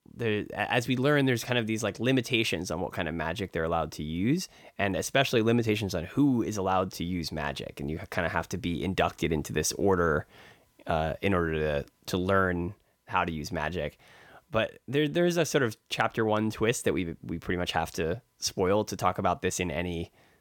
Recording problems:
none

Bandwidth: 17 kHz